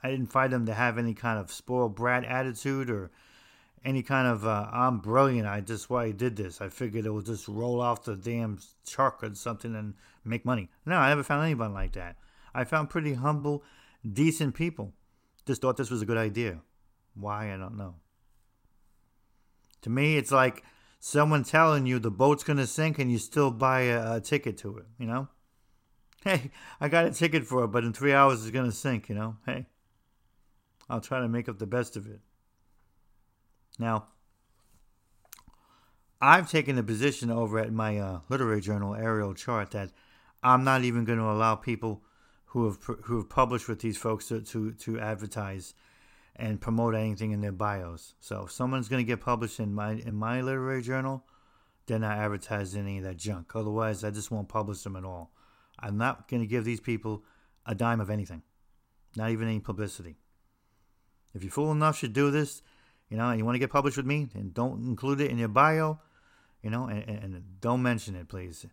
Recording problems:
uneven, jittery; strongly; from 3.5 s to 1:07

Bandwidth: 16 kHz